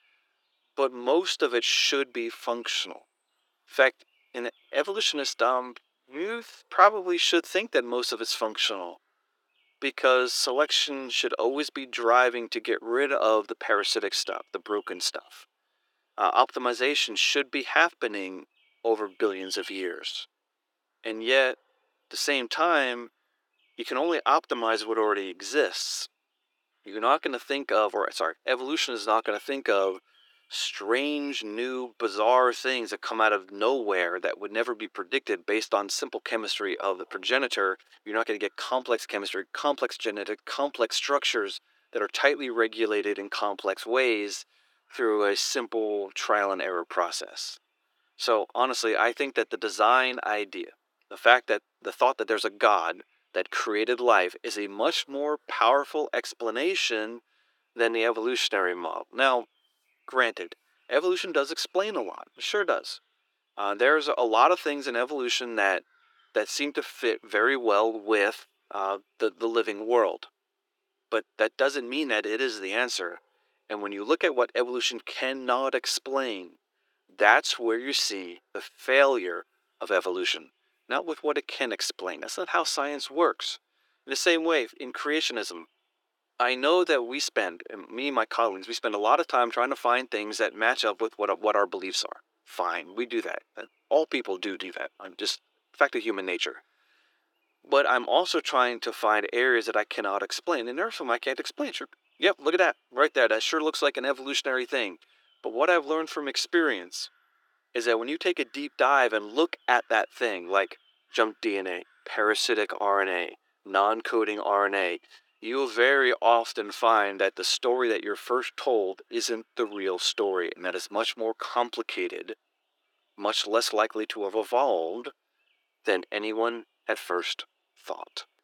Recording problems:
thin; very; fading below 350 Hz

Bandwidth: 18 kHz